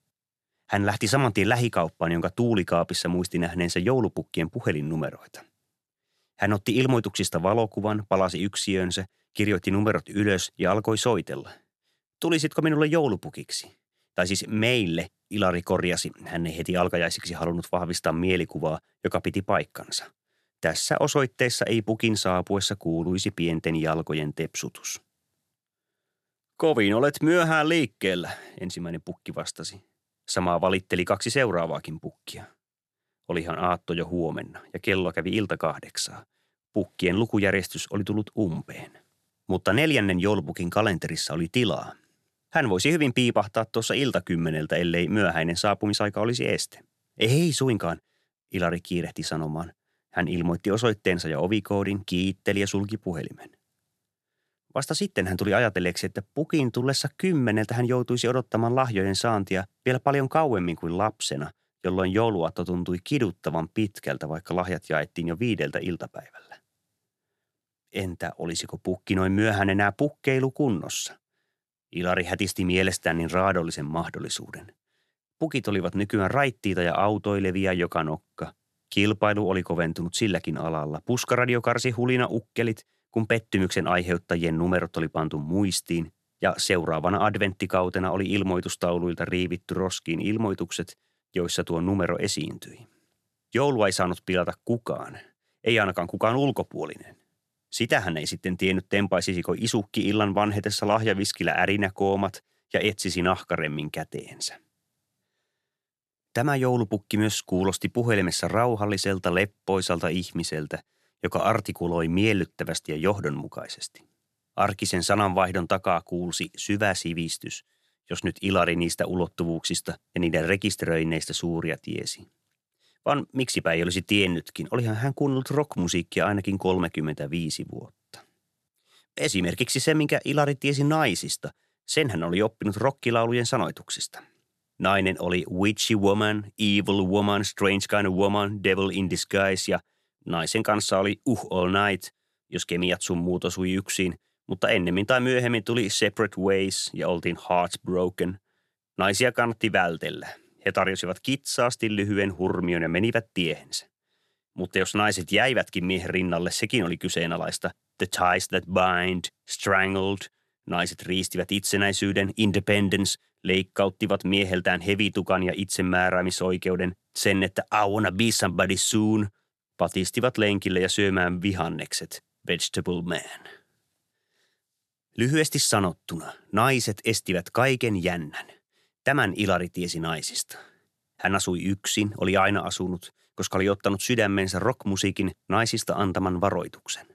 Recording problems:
uneven, jittery; slightly; from 4.5 s to 2:49

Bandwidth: 13.5 kHz